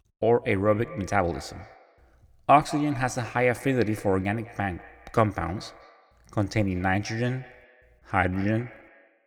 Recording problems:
echo of what is said; faint; throughout; 190 ms later, 20 dB below the speech

